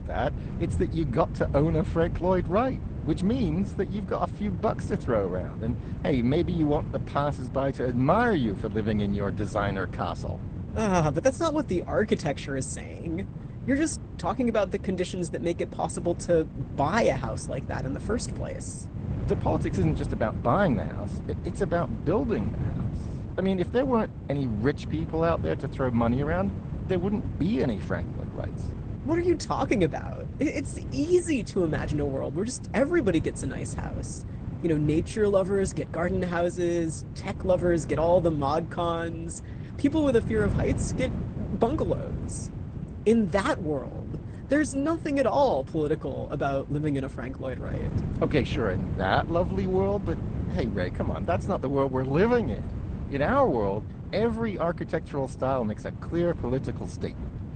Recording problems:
garbled, watery; slightly; nothing above 8.5 kHz
wind noise on the microphone; occasional gusts; 15 dB below the speech

